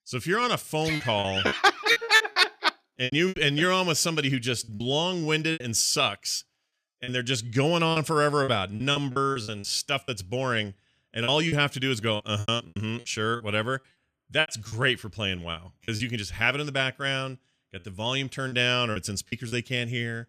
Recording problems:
choppy; very; 10% of the speech affected

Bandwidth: 14.5 kHz